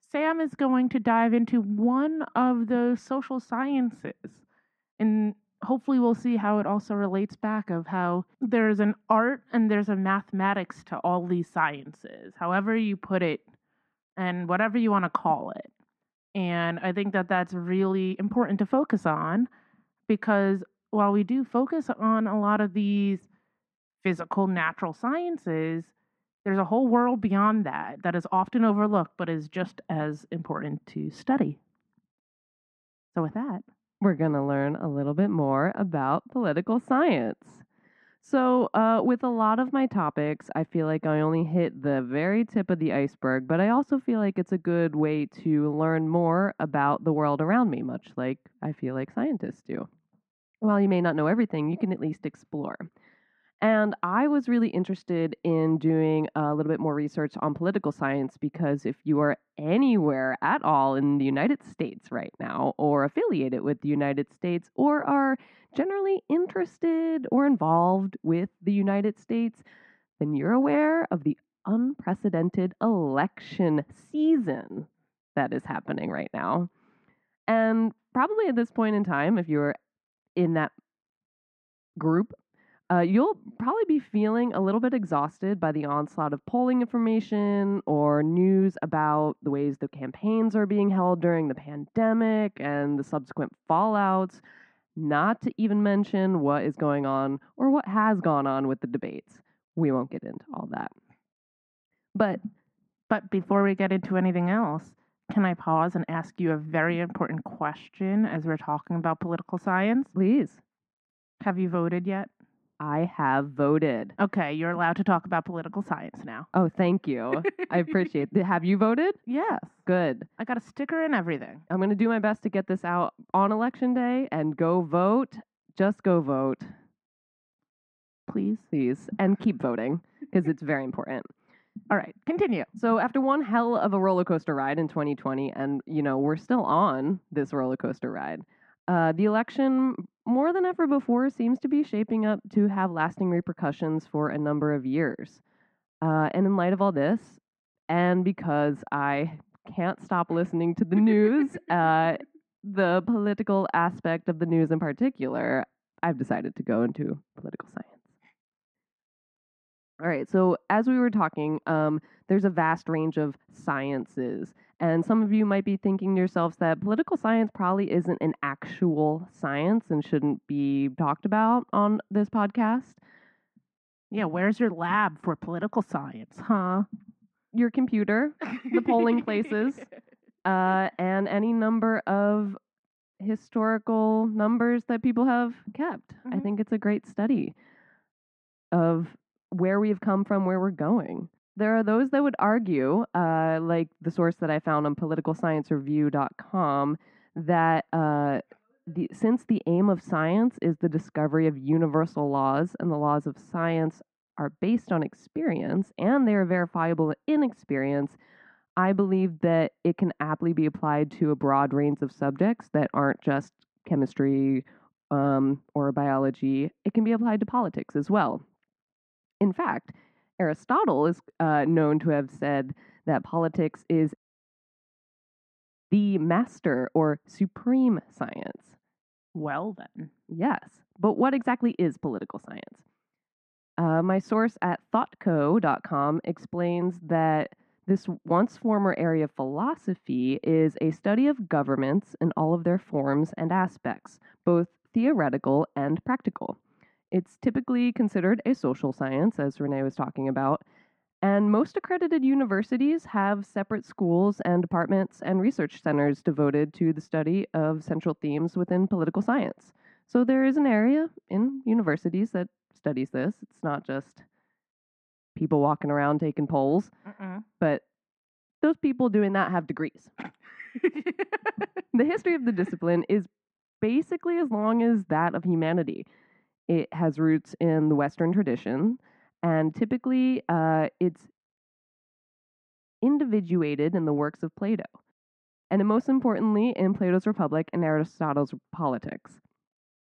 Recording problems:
muffled; very; fading above 1.5 kHz

